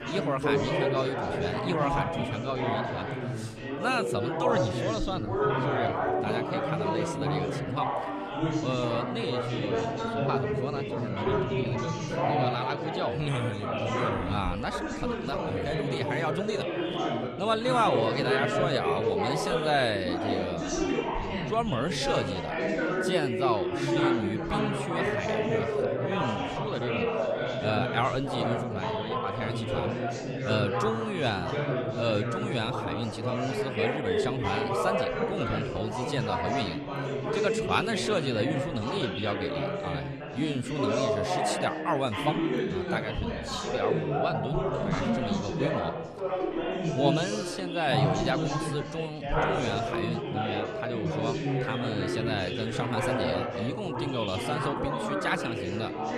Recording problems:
chatter from many people; very loud; throughout; 2 dB above the speech

